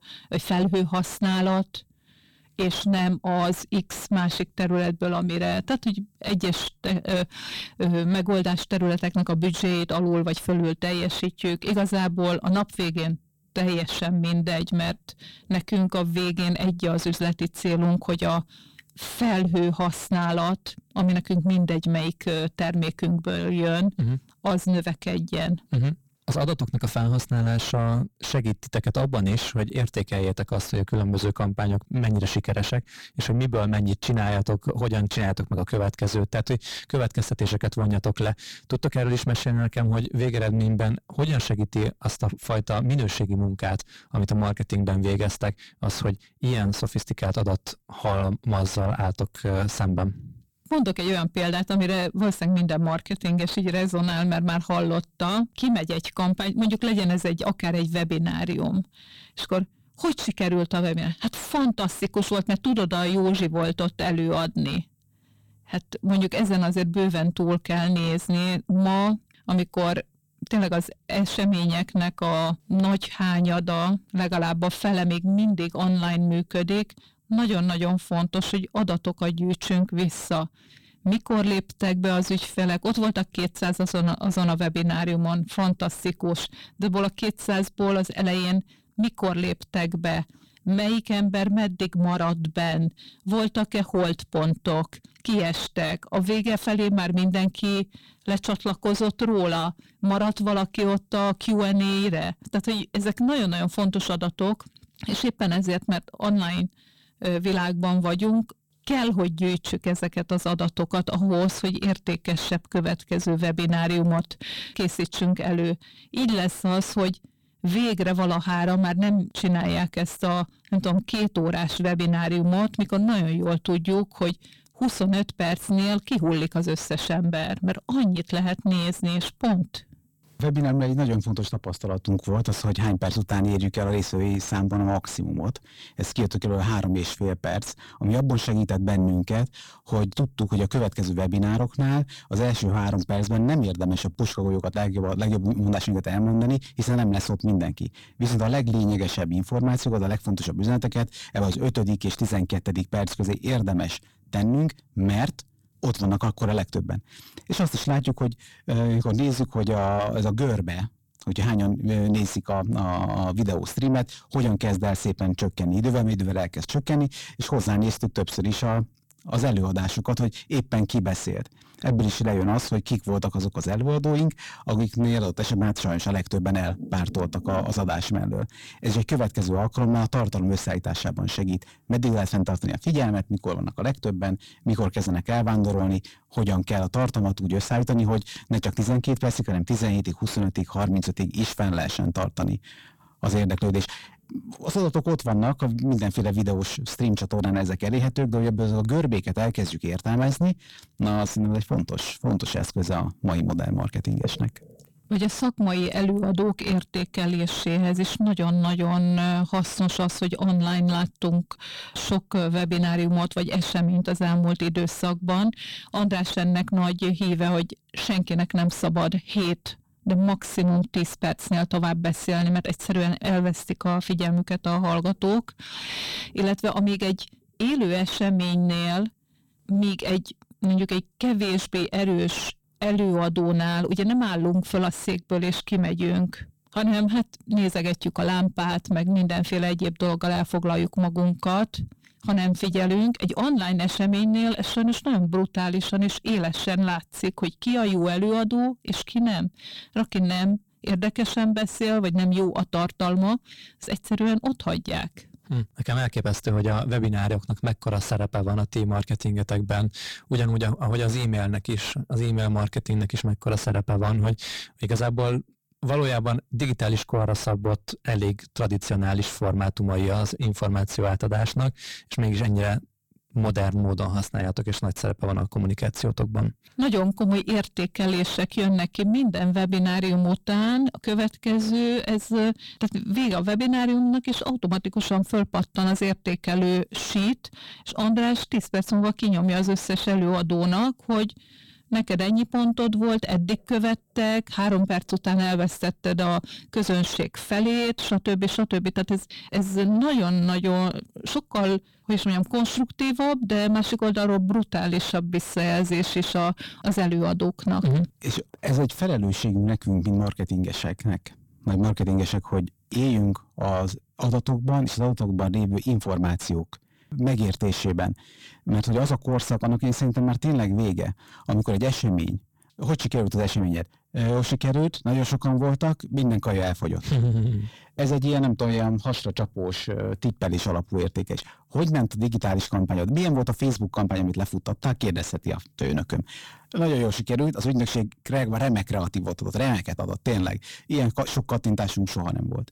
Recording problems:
distortion; heavy; 6 dB below the speech

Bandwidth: 18 kHz